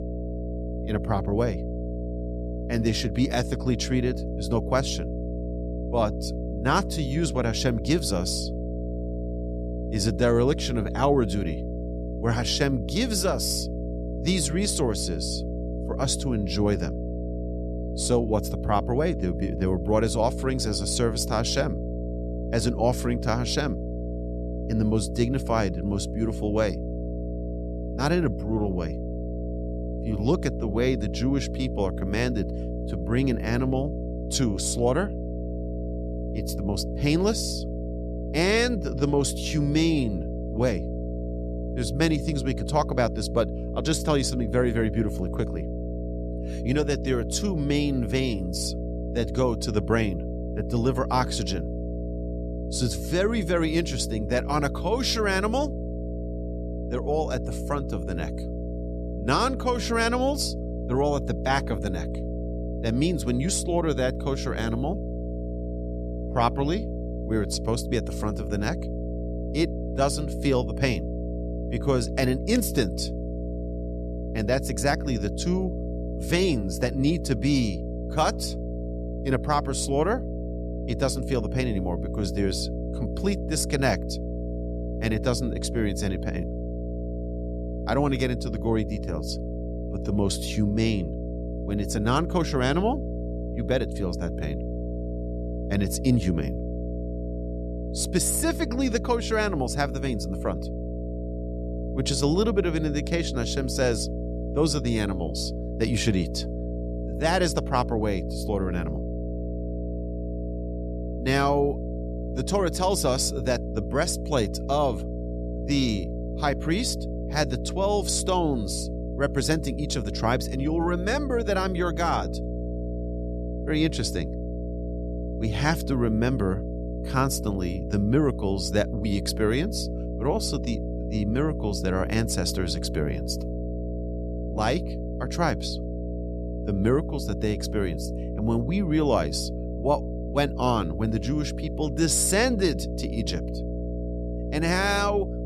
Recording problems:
electrical hum; loud; throughout; 60 Hz, 10 dB below the speech

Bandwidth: 13.5 kHz